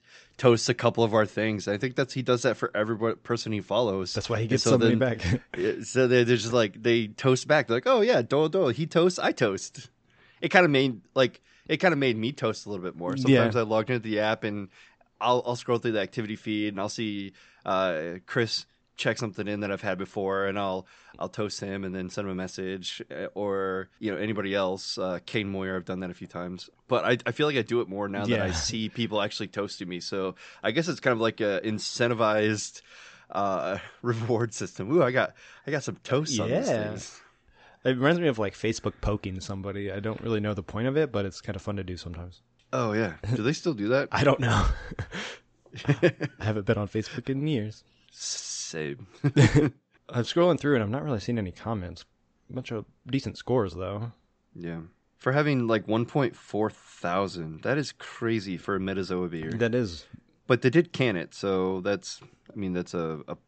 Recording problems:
high frequencies cut off; noticeable; nothing above 8 kHz

